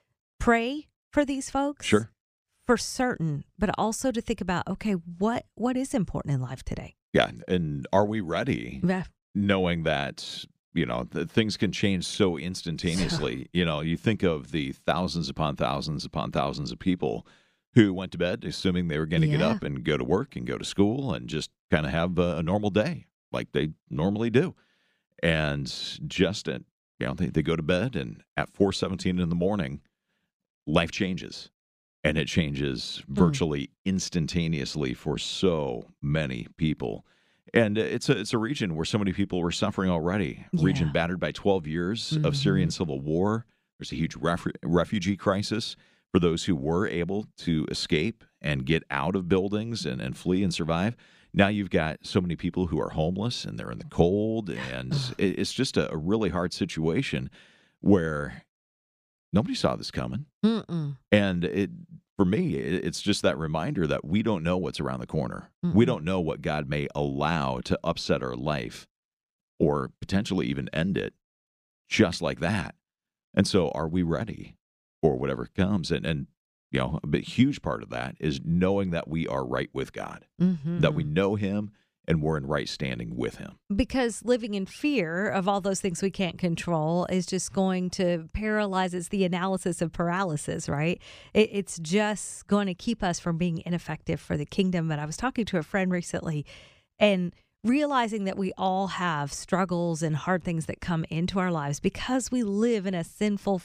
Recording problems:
none

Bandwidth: 15 kHz